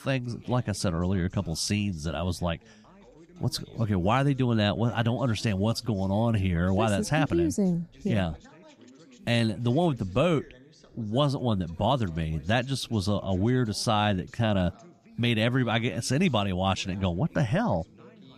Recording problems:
background chatter; faint; throughout; 3 voices, 25 dB below the speech

